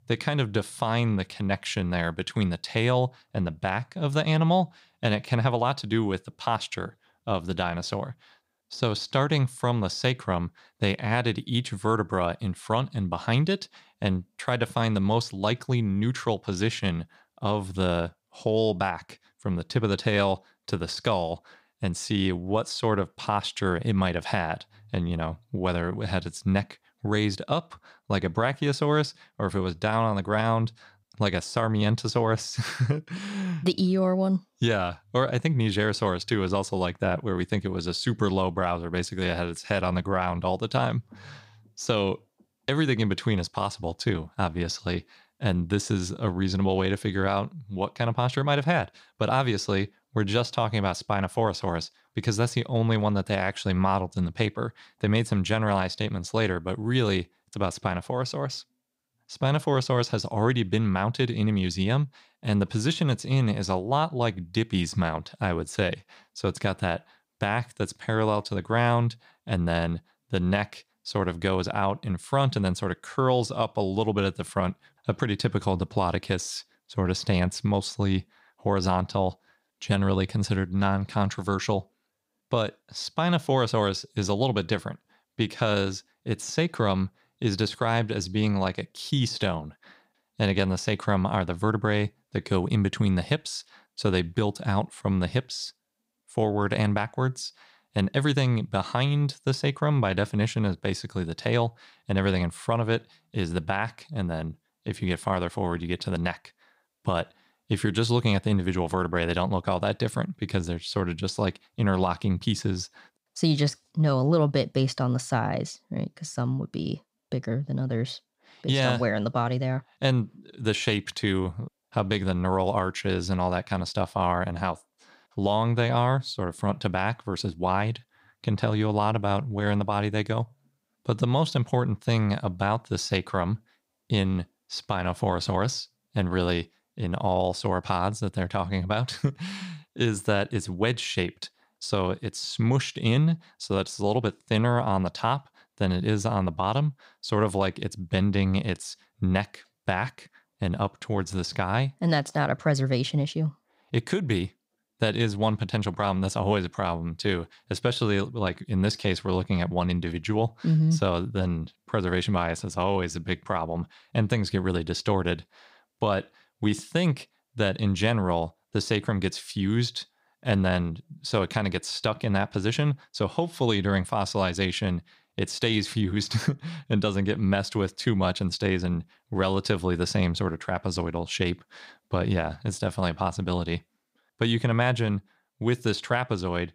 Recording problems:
none

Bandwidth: 15.5 kHz